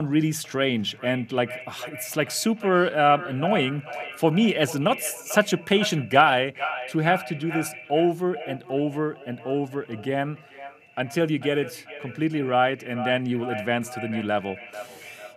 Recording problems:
echo of what is said; strong; throughout; 440 ms later, 10 dB below the speech
abrupt cut into speech; at the start

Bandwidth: 15 kHz